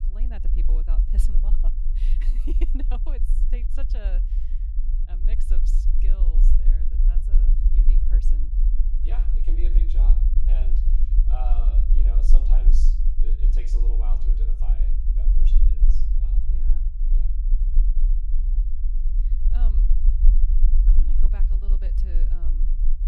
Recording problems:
low rumble; loud; throughout; 2 dB below the speech

